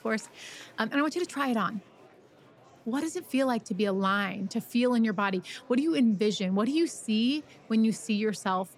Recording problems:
murmuring crowd; faint; throughout; 25 dB below the speech

